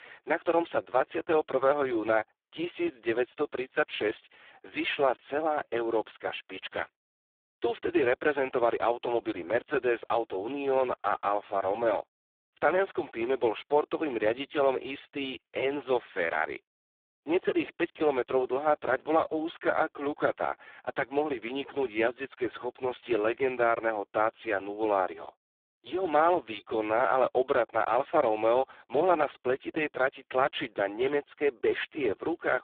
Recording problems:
phone-call audio; poor line

